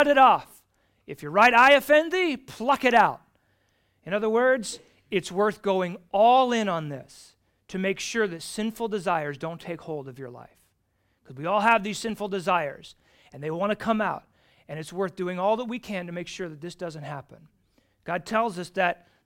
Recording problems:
abrupt cut into speech; at the start

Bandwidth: 16.5 kHz